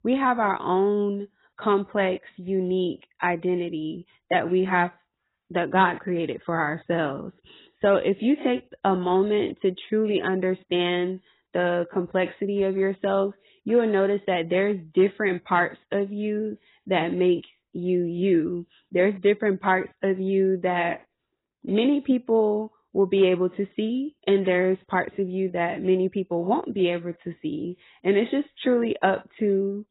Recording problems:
garbled, watery; badly; nothing above 4 kHz

